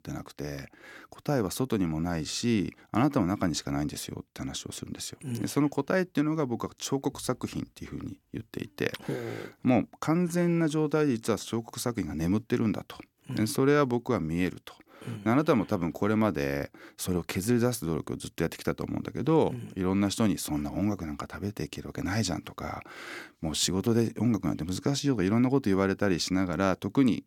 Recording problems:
none

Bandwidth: 17.5 kHz